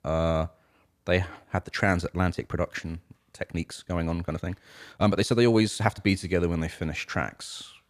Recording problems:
uneven, jittery; strongly; from 1.5 to 6 s

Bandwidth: 14.5 kHz